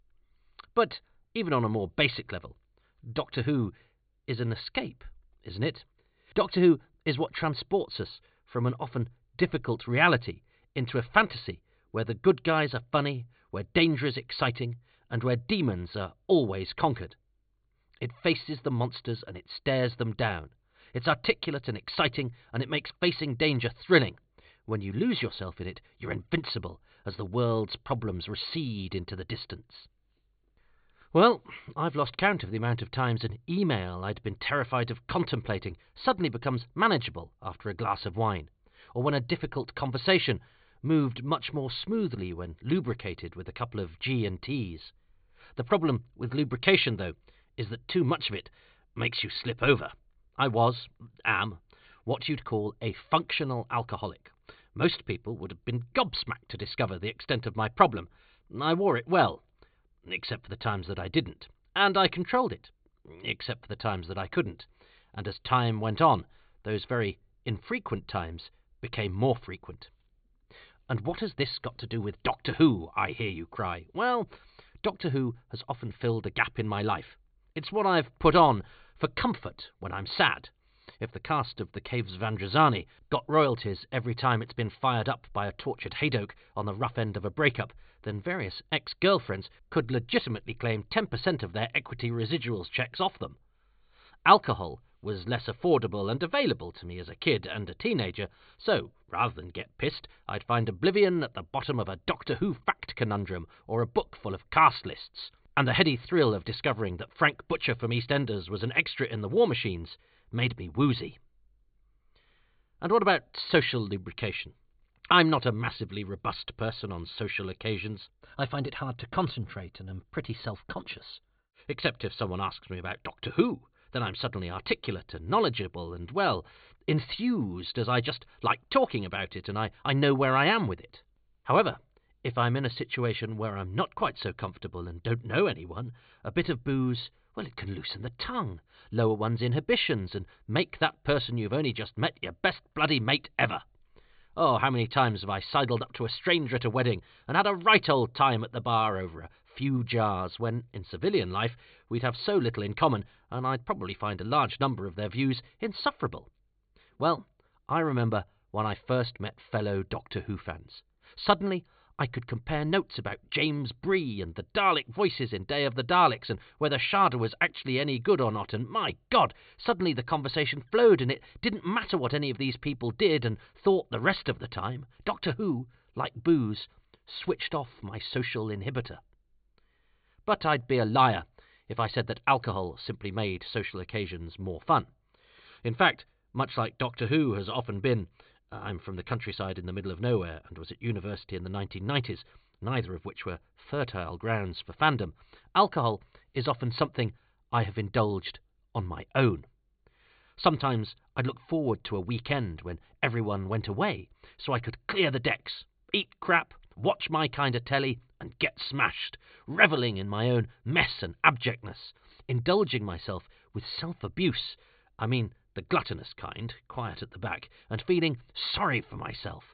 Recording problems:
high frequencies cut off; severe; nothing above 4.5 kHz

